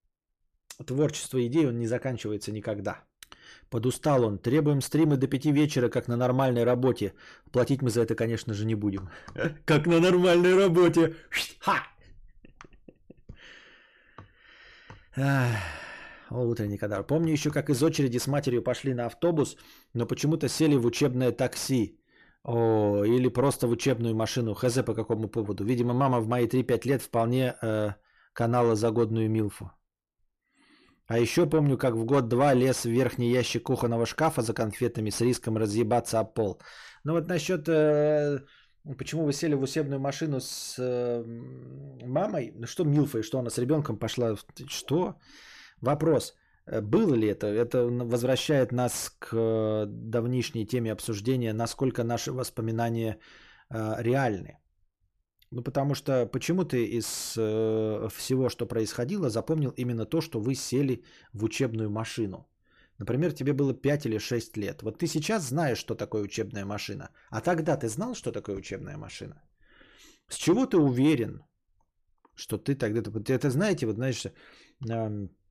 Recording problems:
distortion; slight; 10 dB below the speech

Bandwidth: 14.5 kHz